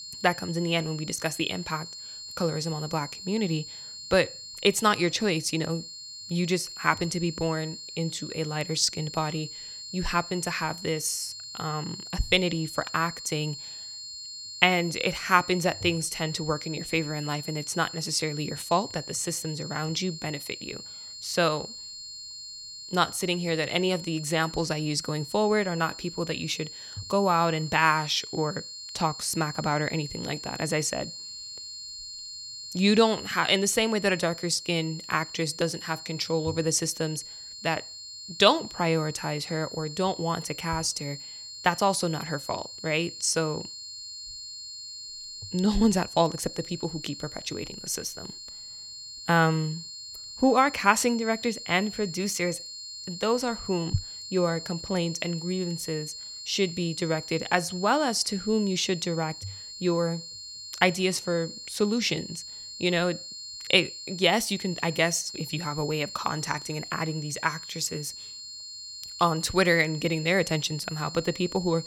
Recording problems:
high-pitched whine; noticeable; throughout; 4.5 kHz, 10 dB below the speech

